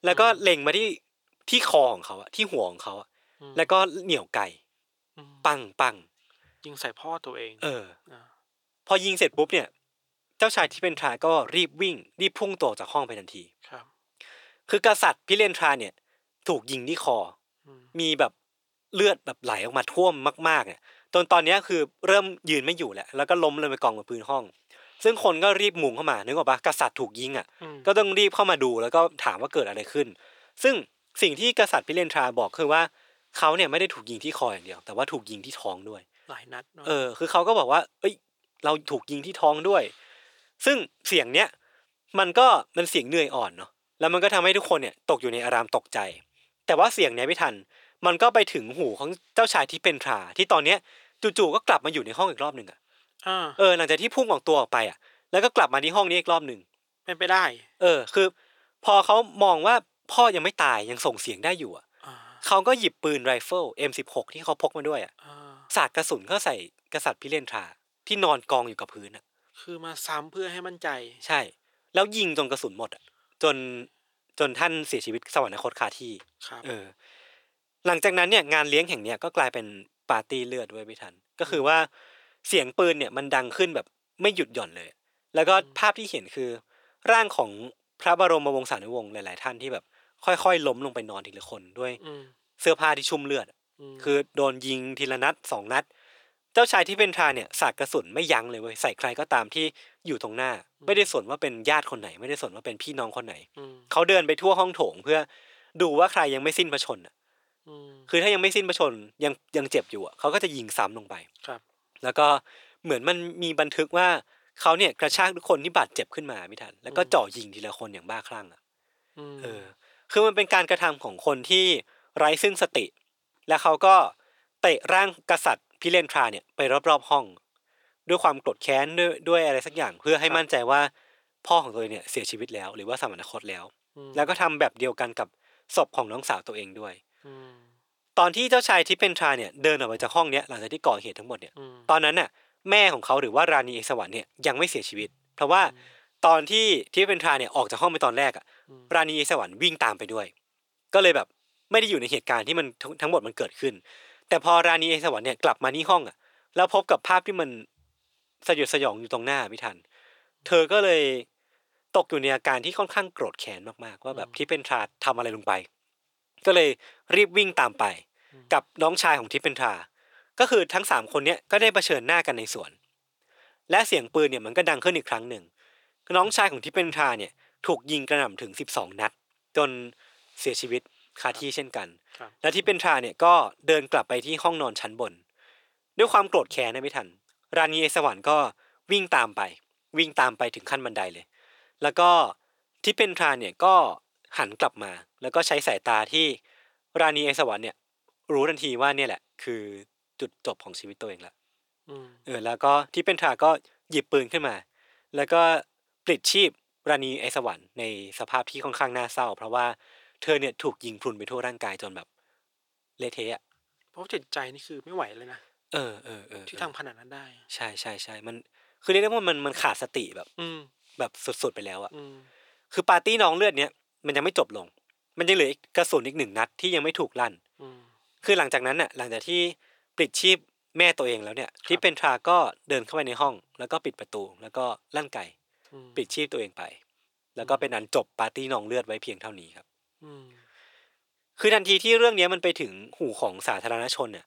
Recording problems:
thin; somewhat; fading below 500 Hz

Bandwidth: 18 kHz